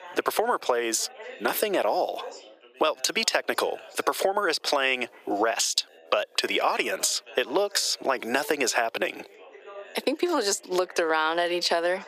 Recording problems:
thin; very; fading below 400 Hz
squashed, flat; somewhat, background pumping
background chatter; faint; throughout; 3 voices, 20 dB below the speech

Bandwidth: 15 kHz